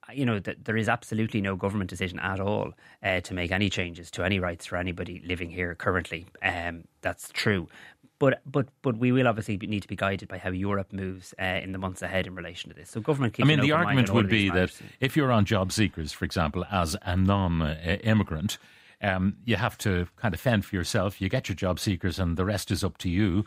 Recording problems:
none

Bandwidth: 15.5 kHz